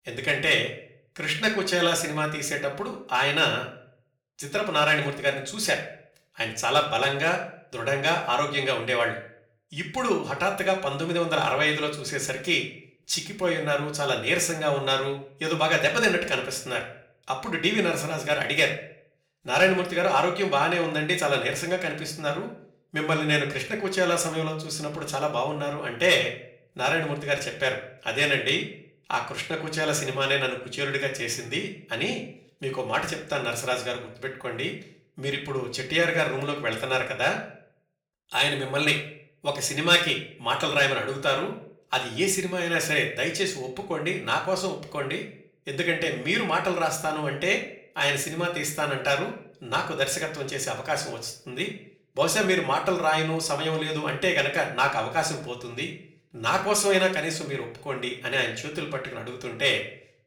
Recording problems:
off-mic speech; far
room echo; slight; dies away in 0.4 s

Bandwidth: 18.5 kHz